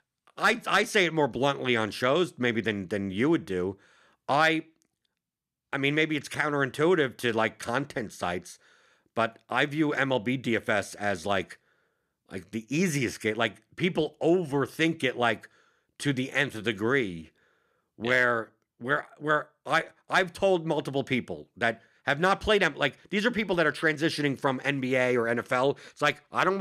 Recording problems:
abrupt cut into speech; at the end

